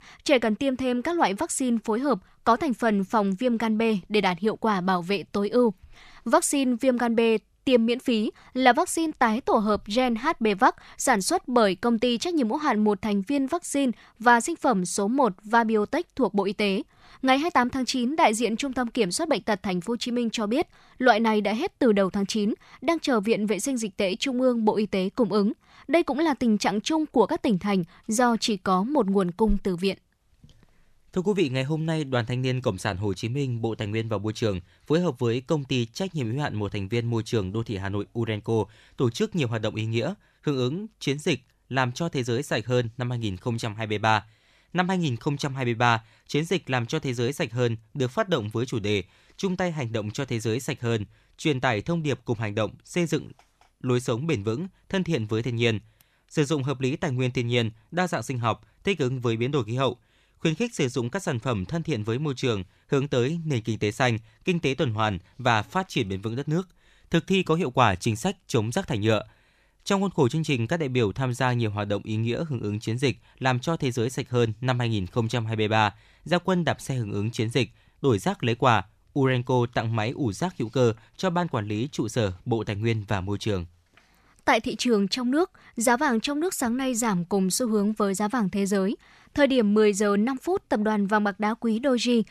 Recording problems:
none

